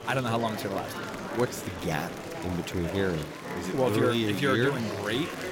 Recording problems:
murmuring crowd; loud; throughout; 7 dB below the speech

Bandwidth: 16.5 kHz